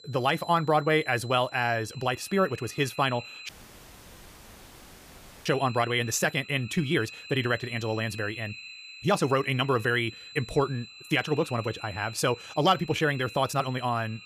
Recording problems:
wrong speed, natural pitch; too fast; 1.5 times normal speed
echo of what is said; faint; throughout; 530 ms later, 20 dB below the speech
high-pitched whine; noticeable; throughout; 4 kHz, 20 dB below the speech
audio cutting out; at 3.5 s for 2 s

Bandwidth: 15 kHz